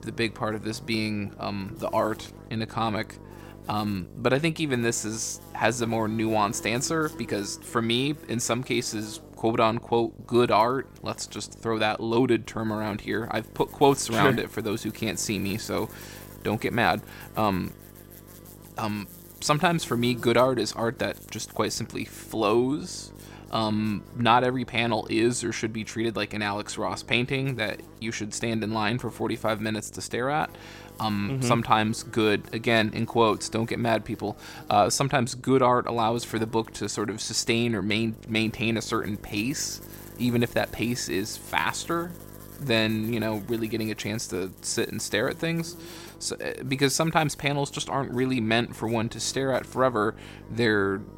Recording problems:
electrical hum; faint; throughout; 50 Hz, 25 dB below the speech

